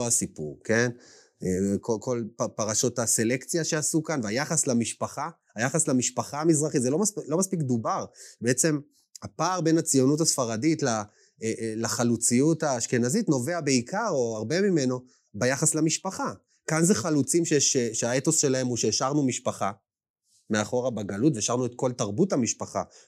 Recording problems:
abrupt cut into speech; at the start

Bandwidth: 15.5 kHz